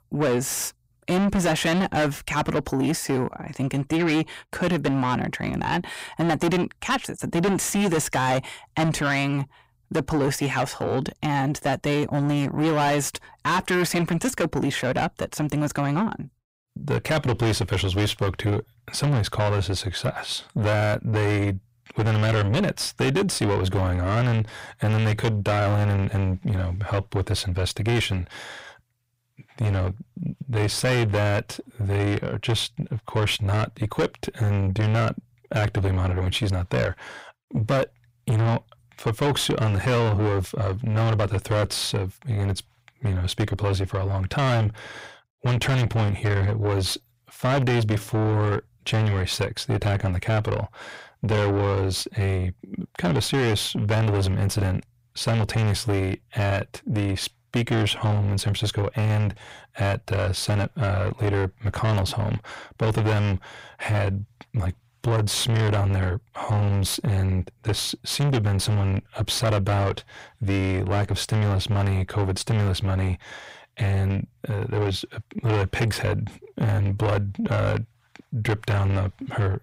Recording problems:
distortion; heavy; 5 dB below the speech

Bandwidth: 15.5 kHz